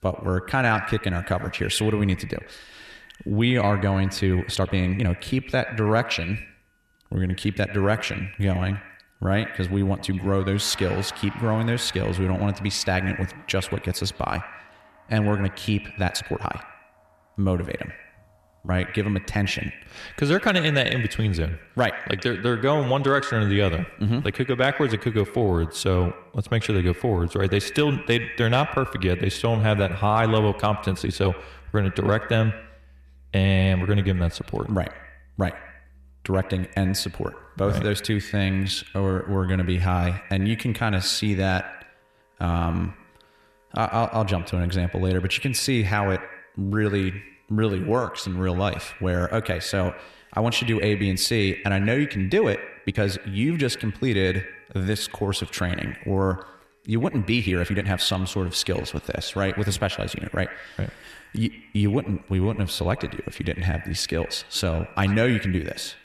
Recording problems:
echo of what is said; noticeable; throughout; 90 ms later, 15 dB below the speech
background music; faint; throughout; 25 dB below the speech
uneven, jittery; strongly; from 4.5 to 58 s

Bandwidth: 13.5 kHz